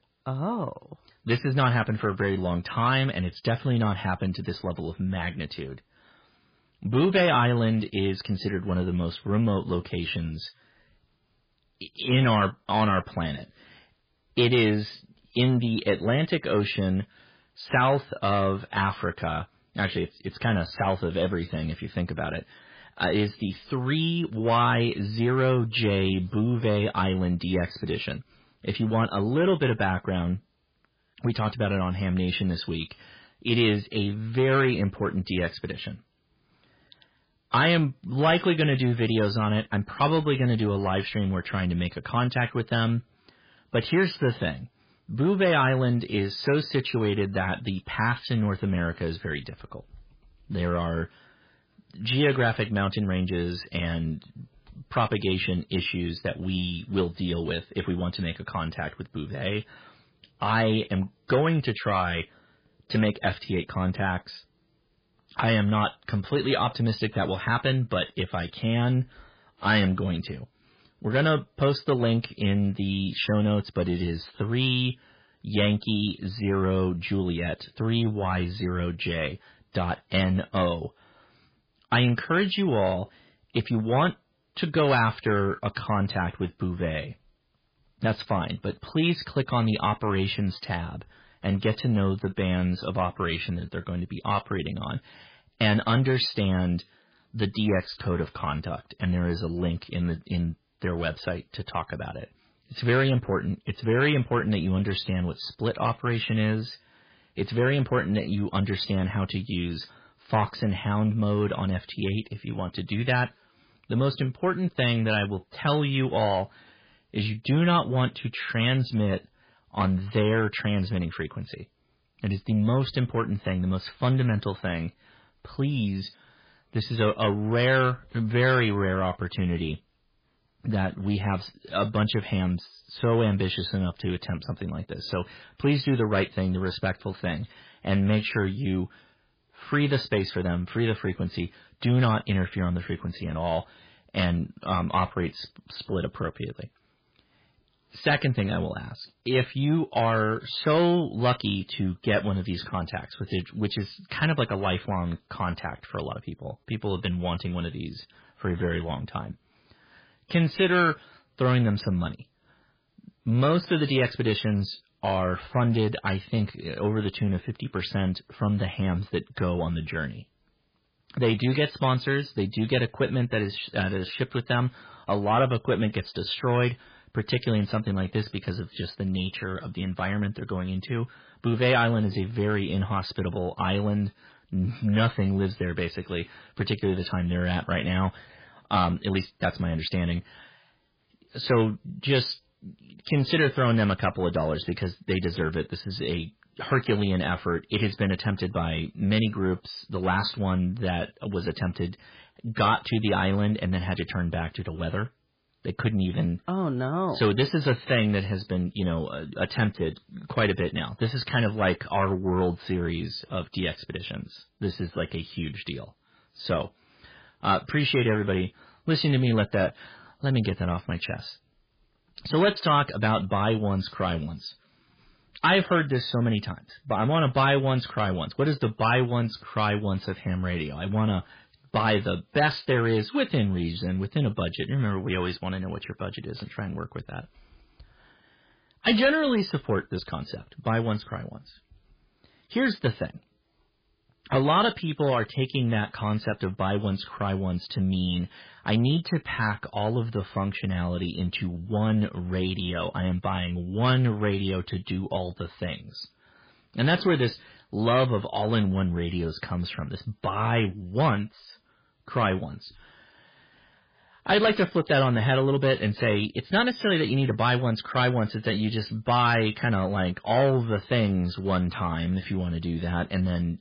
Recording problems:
garbled, watery; badly
distortion; slight; 10 dB below the speech

